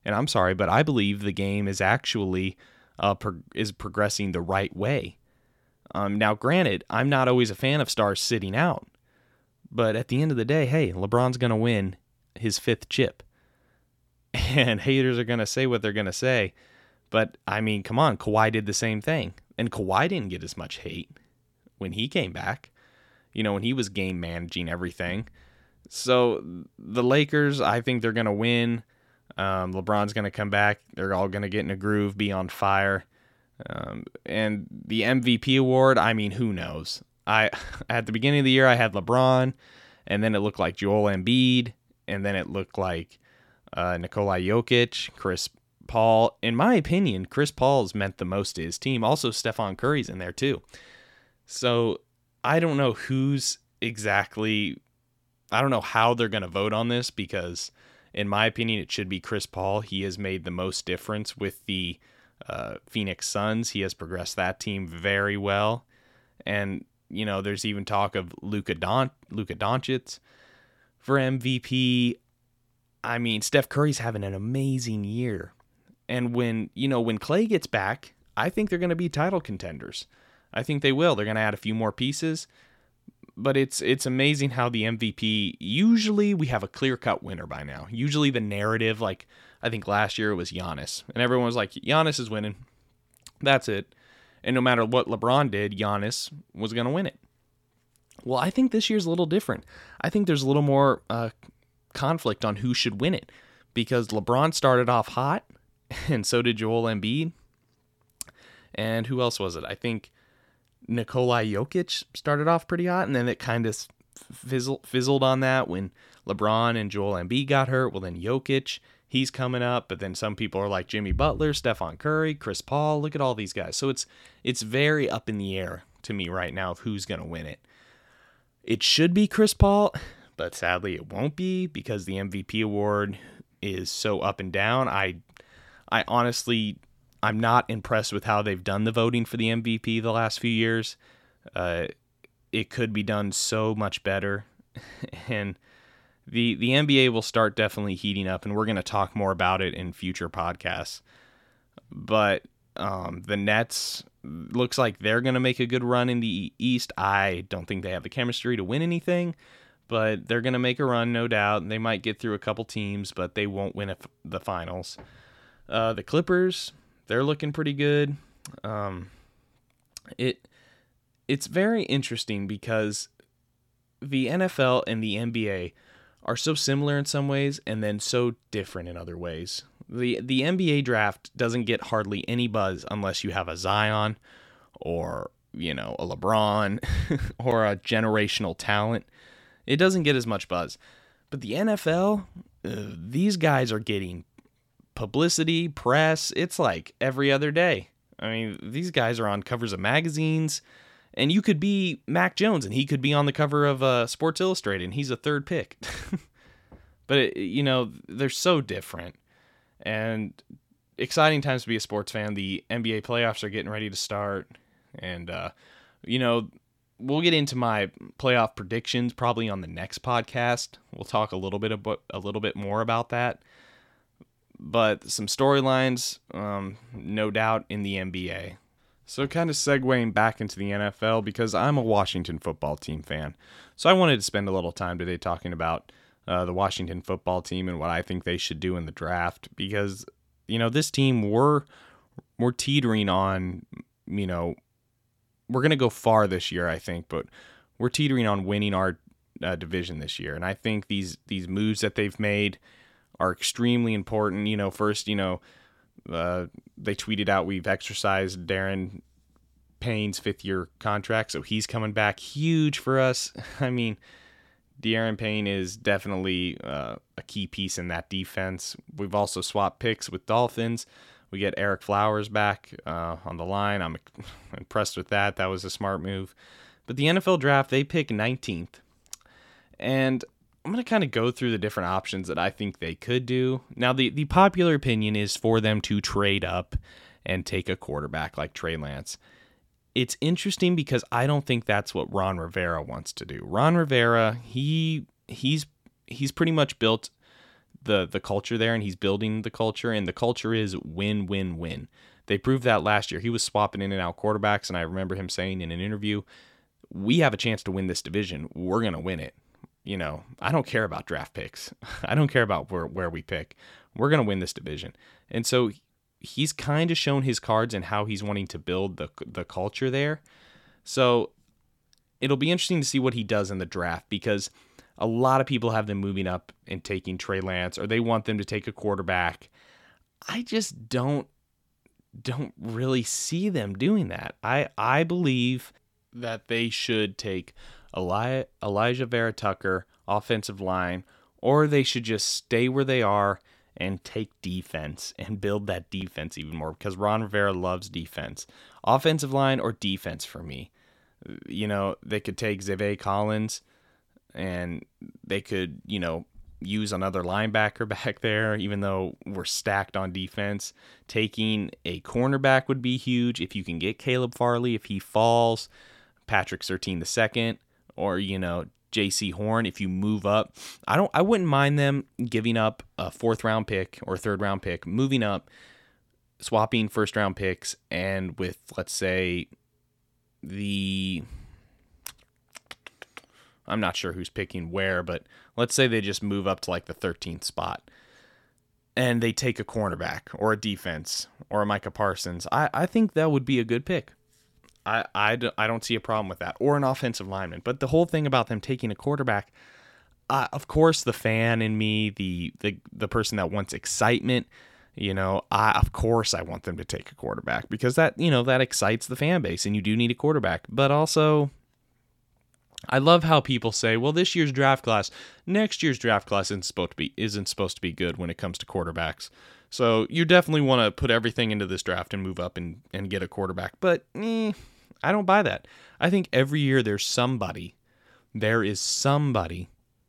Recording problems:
none

